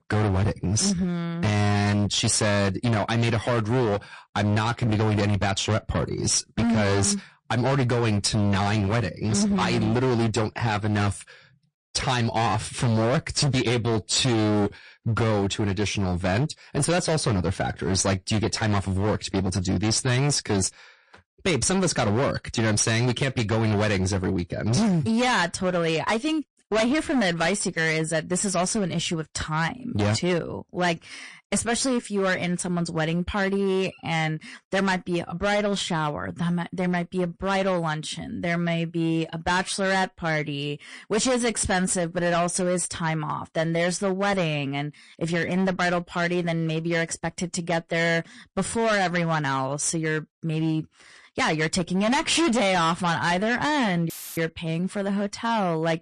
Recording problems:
distortion; heavy; 19% of the sound clipped
garbled, watery; slightly; nothing above 8.5 kHz
audio cutting out; filled with static; at 54 s

